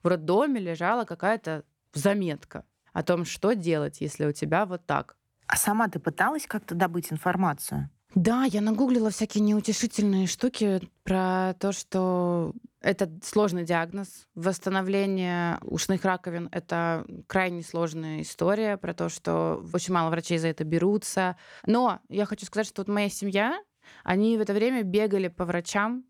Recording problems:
none

